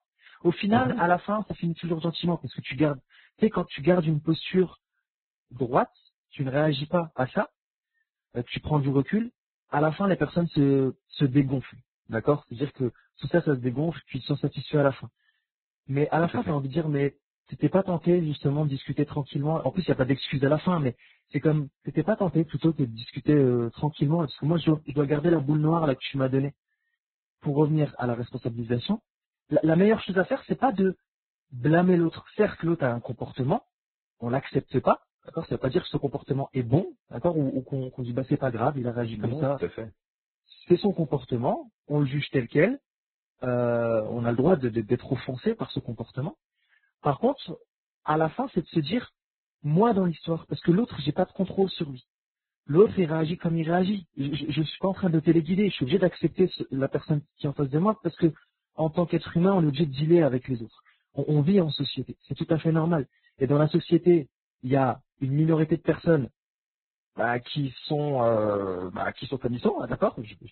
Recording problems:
garbled, watery; badly; nothing above 4 kHz

